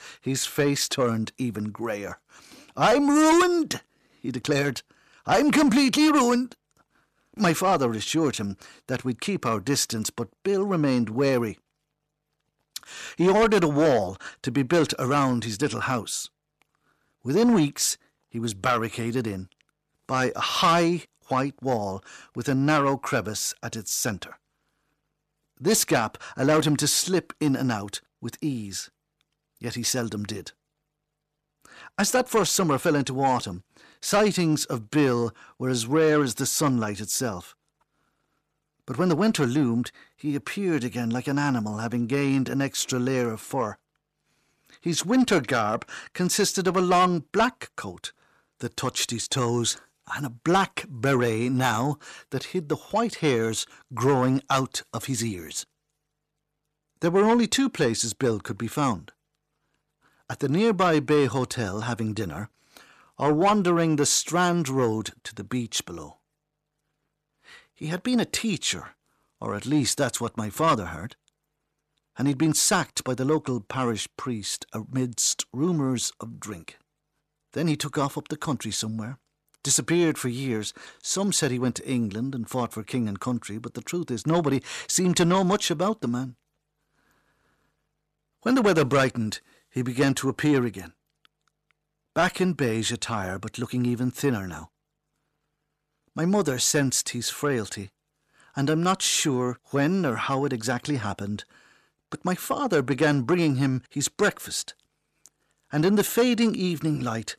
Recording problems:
distortion; slight; 10 dB below the speech

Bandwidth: 14 kHz